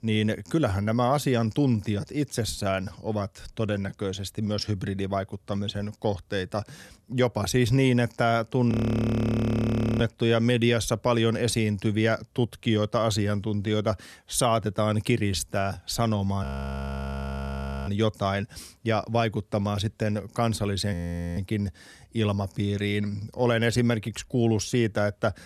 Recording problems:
audio freezing; at 8.5 s for 1.5 s, at 16 s for 1.5 s and at 21 s

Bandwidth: 13.5 kHz